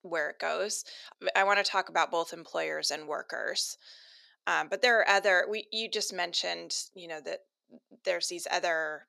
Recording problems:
thin; somewhat; fading below 450 Hz

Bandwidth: 13.5 kHz